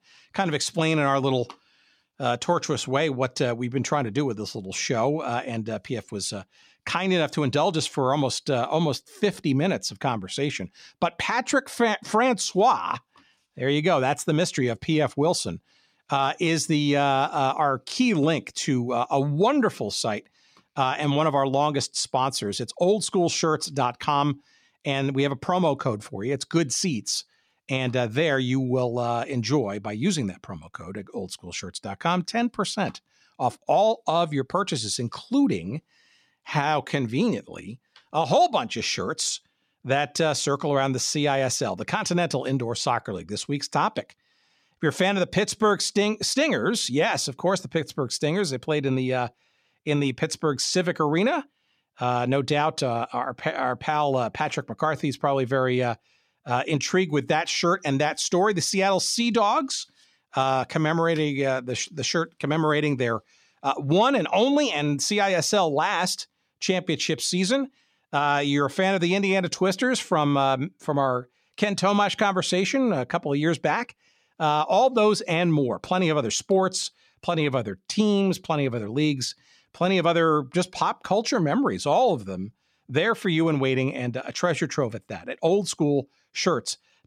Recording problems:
none

